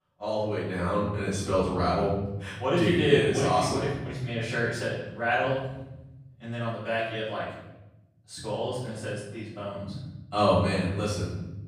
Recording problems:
off-mic speech; far
room echo; noticeable; dies away in 1.1 s

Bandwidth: 15 kHz